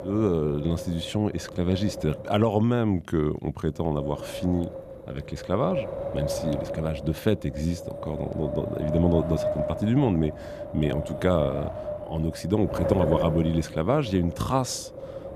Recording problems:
wind noise on the microphone; heavy; 4 dB below the speech

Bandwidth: 14.5 kHz